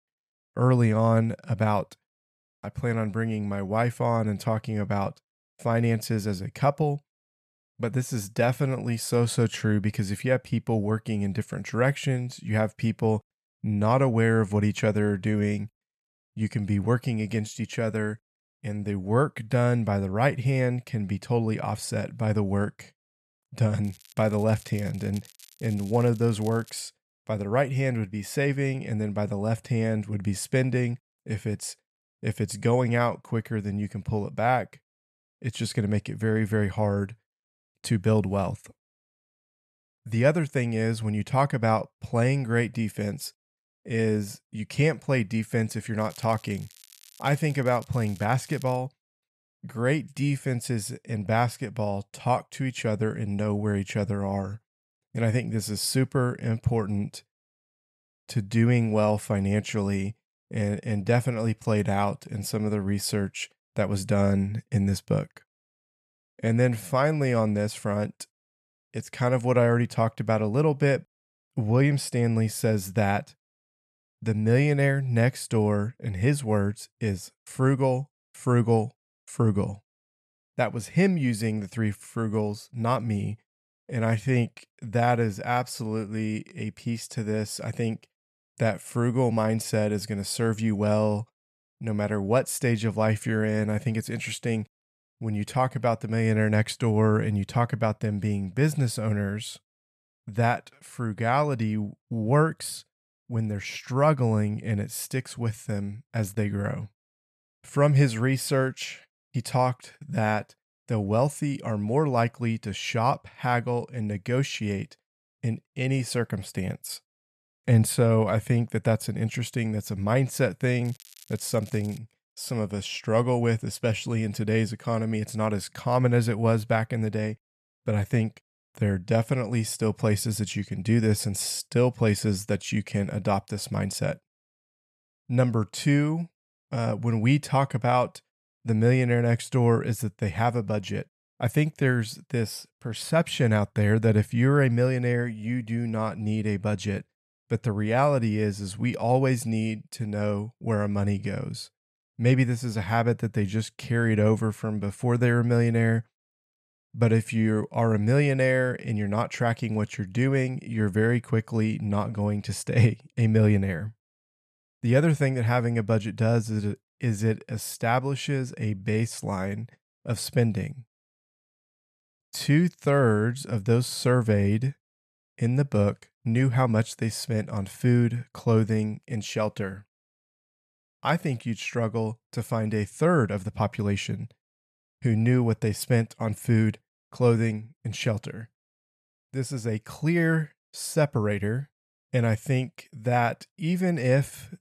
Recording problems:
crackling; faint; from 24 to 27 s, from 46 to 49 s and from 2:01 to 2:02; 25 dB below the speech

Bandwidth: 13.5 kHz